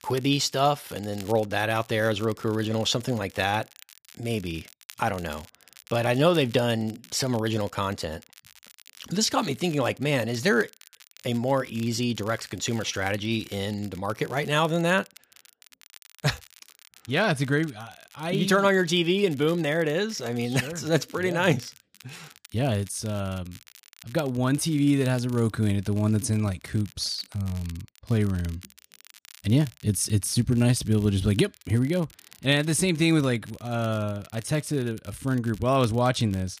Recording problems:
crackle, like an old record; faint; 25 dB below the speech

